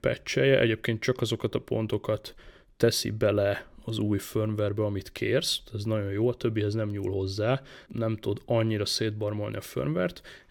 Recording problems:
none

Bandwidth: 18 kHz